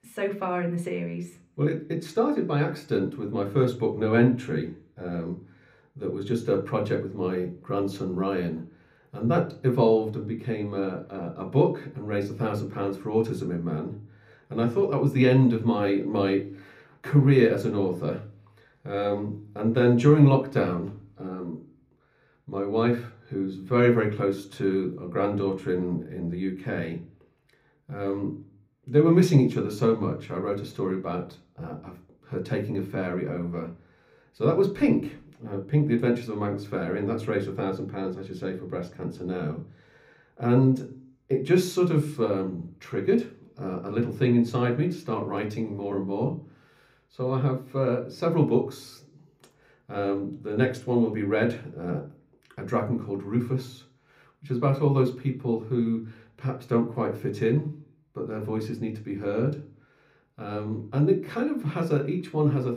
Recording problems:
room echo; very slight; dies away in 0.4 s
off-mic speech; somewhat distant

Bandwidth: 15.5 kHz